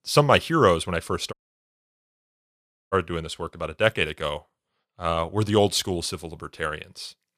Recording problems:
audio cutting out; at 1.5 s for 1.5 s

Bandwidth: 14 kHz